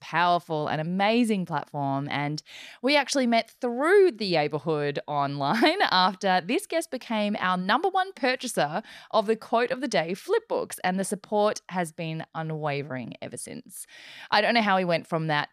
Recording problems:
none

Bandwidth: 14.5 kHz